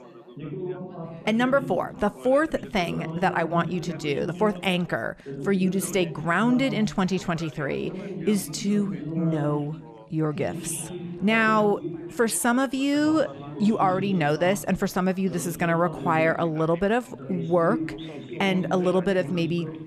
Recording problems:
background chatter; noticeable; throughout; 4 voices, 10 dB below the speech

